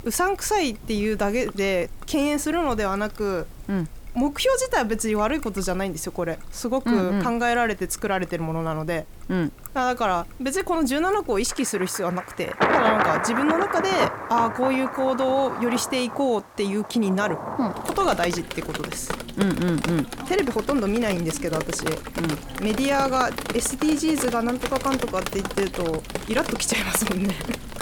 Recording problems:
rain or running water; loud; throughout; 5 dB below the speech

